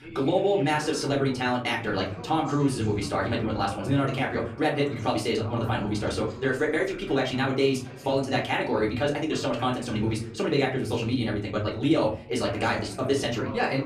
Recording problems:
off-mic speech; far
wrong speed, natural pitch; too fast; 1.6 times normal speed
room echo; very slight; dies away in 0.4 s
voice in the background; noticeable; throughout; 15 dB below the speech

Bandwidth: 14.5 kHz